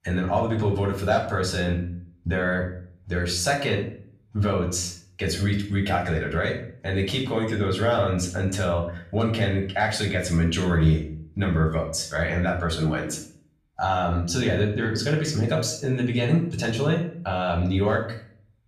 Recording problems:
off-mic speech; far
room echo; slight; dies away in 0.5 s

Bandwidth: 14.5 kHz